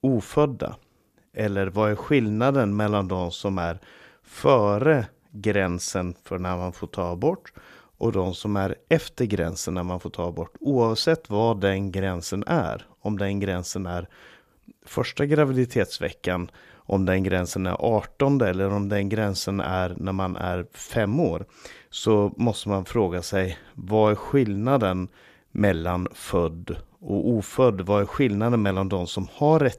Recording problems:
none

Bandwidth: 14.5 kHz